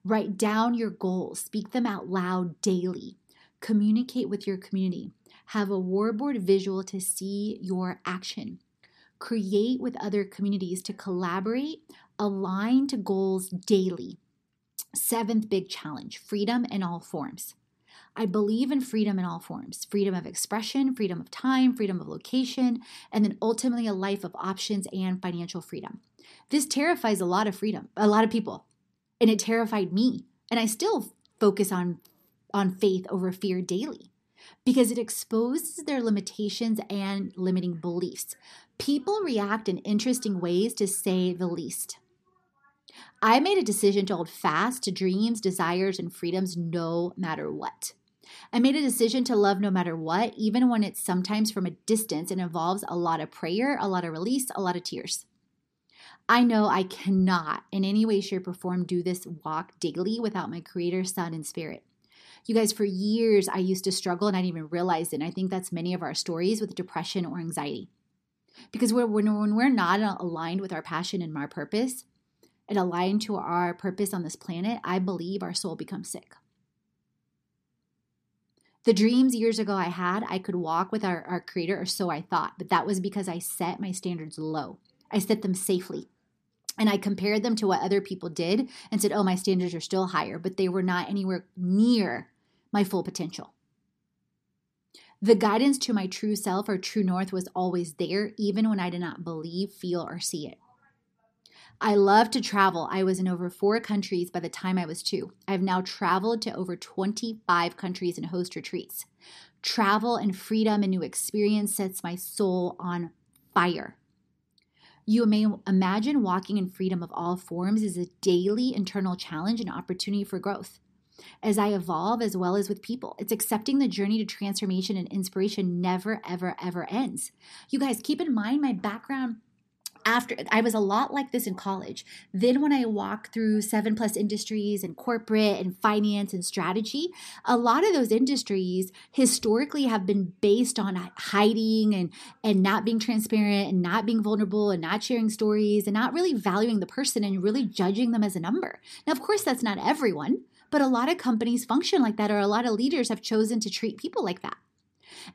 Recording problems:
none

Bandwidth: 14 kHz